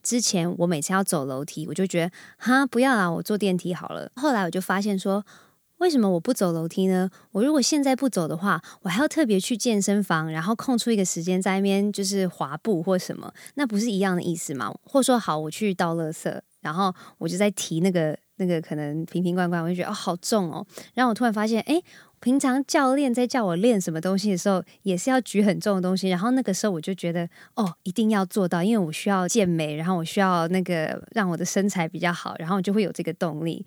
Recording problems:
none

